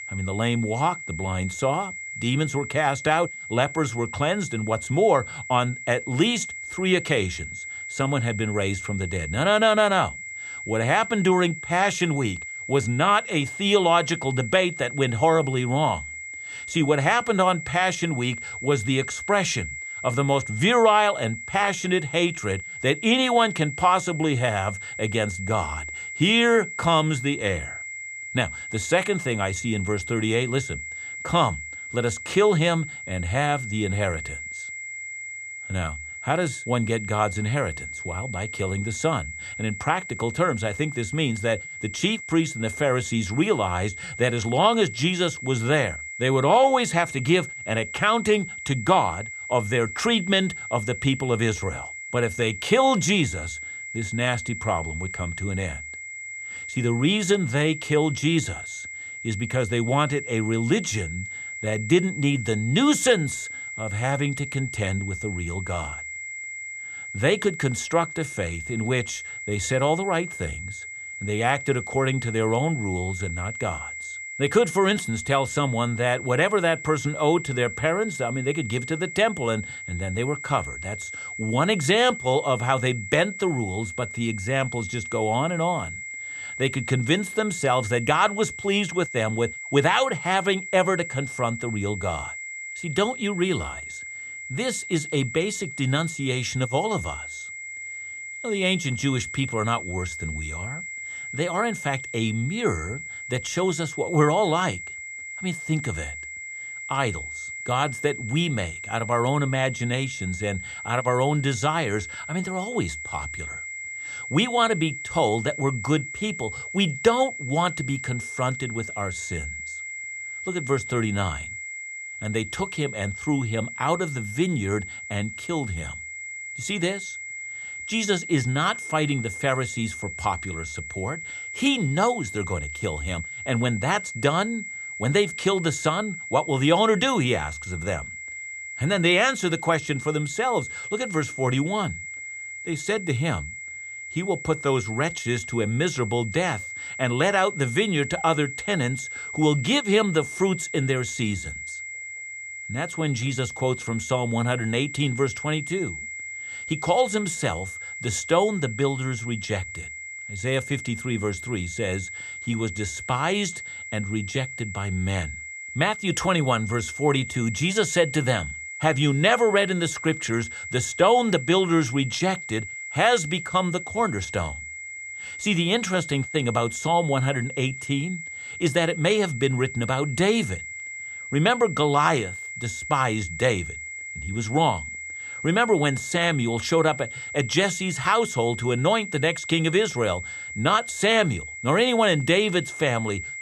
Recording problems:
high-pitched whine; loud; throughout; 2 kHz, 9 dB below the speech

